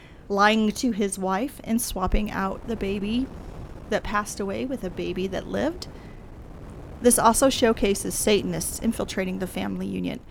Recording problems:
wind noise on the microphone; occasional gusts; 20 dB below the speech

